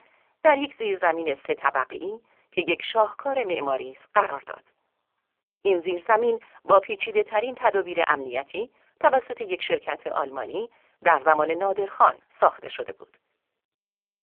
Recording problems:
phone-call audio; poor line; nothing above 3.5 kHz

